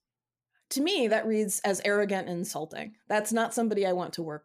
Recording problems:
none

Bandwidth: 15 kHz